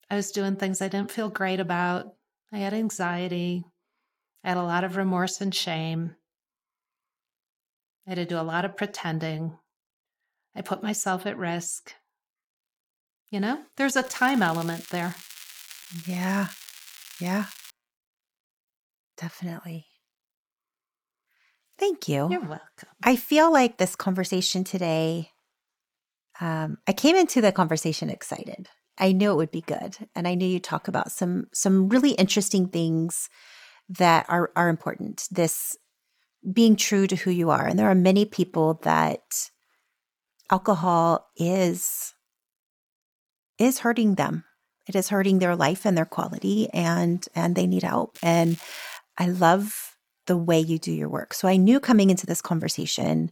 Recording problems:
crackling; noticeable; from 14 to 18 s and at 48 s; 20 dB below the speech

